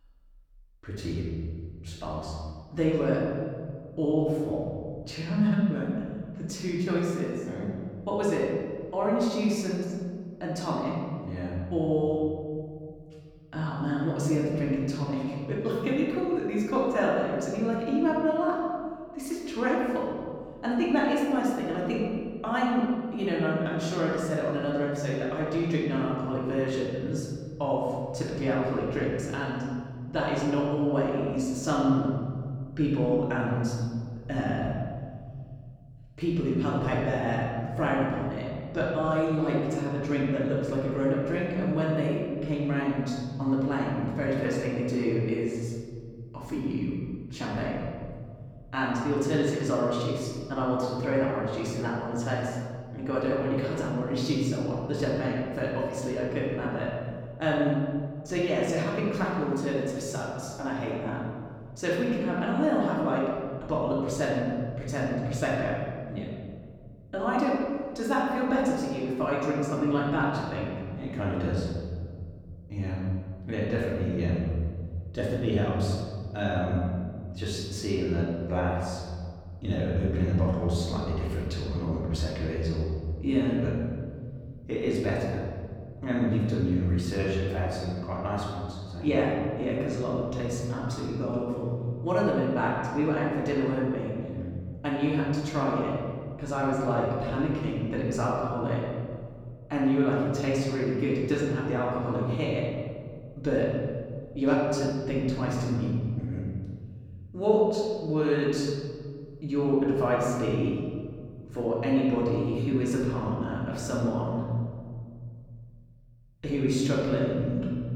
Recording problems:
off-mic speech; far
room echo; noticeable; dies away in 2.1 s

